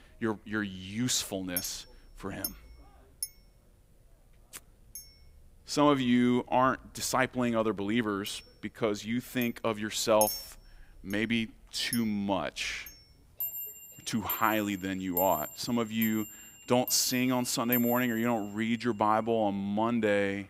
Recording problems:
household noises; loud; throughout; 8 dB below the speech

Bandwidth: 15.5 kHz